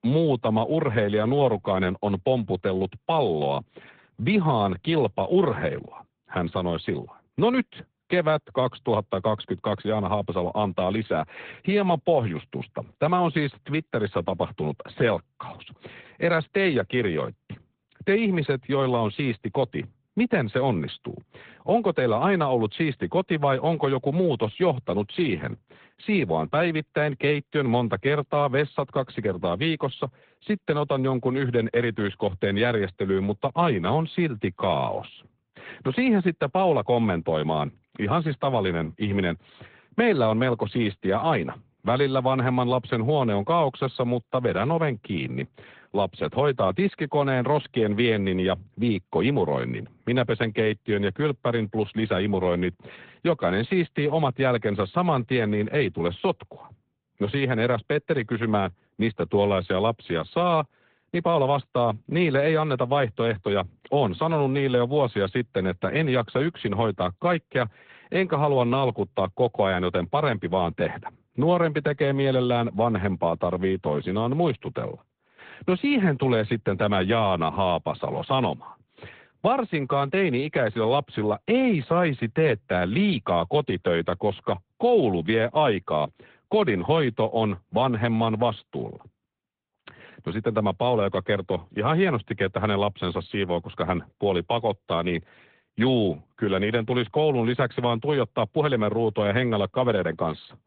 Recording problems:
high frequencies cut off; severe; nothing above 3.5 kHz
garbled, watery; slightly

